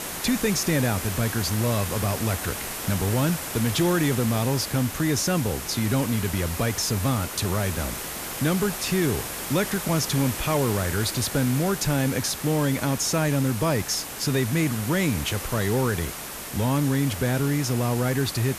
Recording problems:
hiss; loud; throughout; 6 dB below the speech

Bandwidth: 14.5 kHz